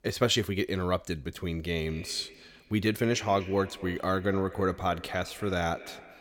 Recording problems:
echo of what is said; noticeable; from 2 s on; 240 ms later, 15 dB below the speech

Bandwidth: 17 kHz